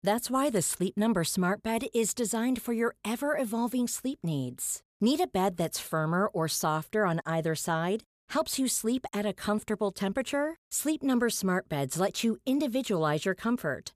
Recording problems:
none

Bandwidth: 14.5 kHz